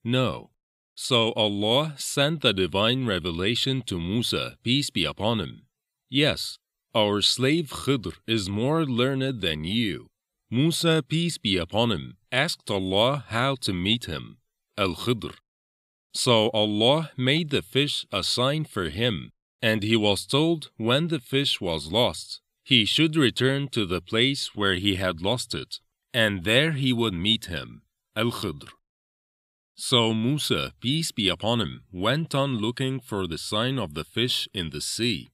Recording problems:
none

